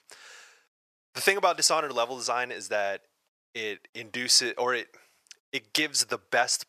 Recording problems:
thin; very; fading below 700 Hz

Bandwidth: 14.5 kHz